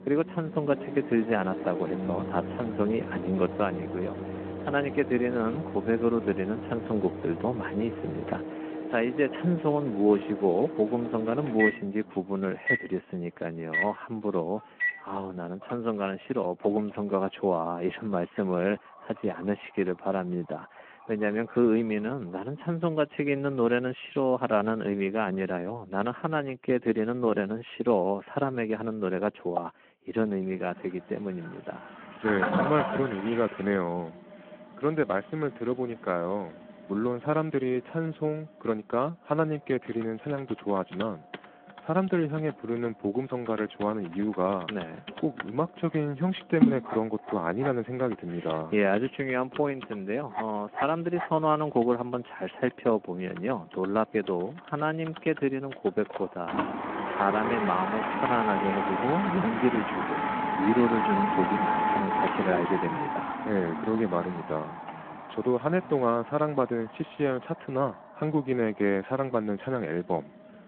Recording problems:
phone-call audio
household noises; loud; throughout; 3 dB below the speech

